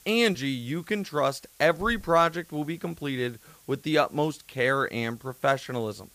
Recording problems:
hiss; faint; throughout; 25 dB below the speech

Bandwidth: 15 kHz